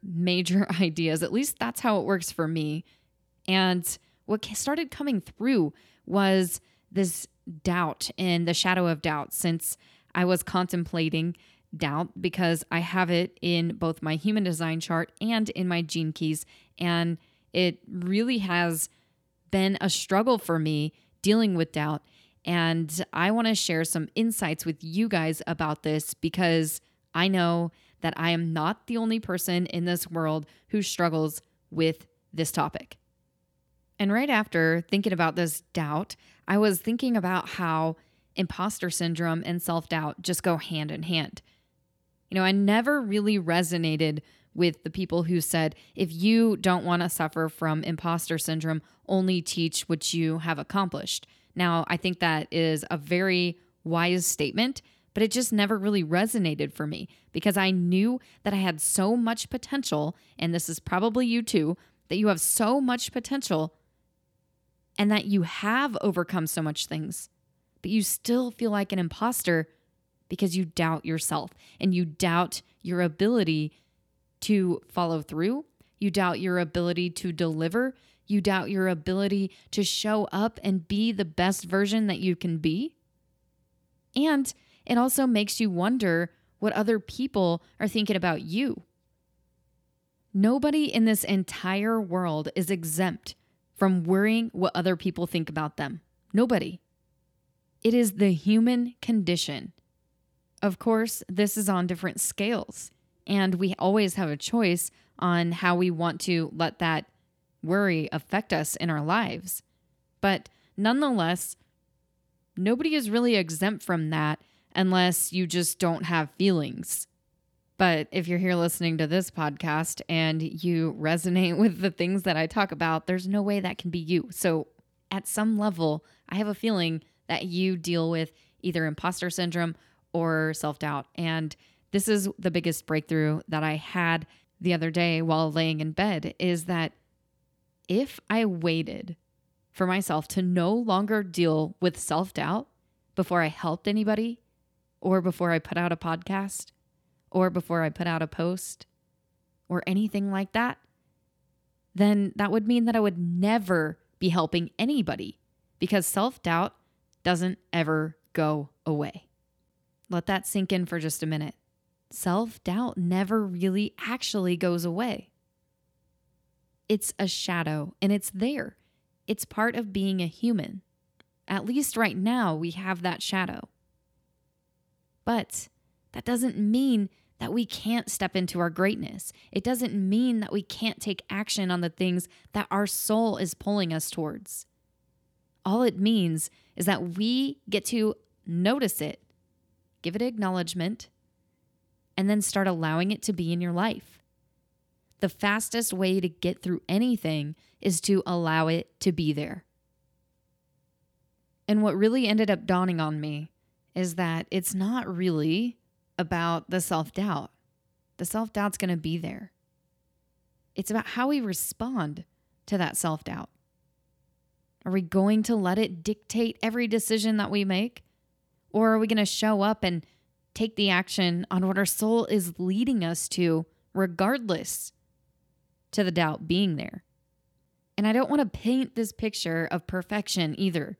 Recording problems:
none

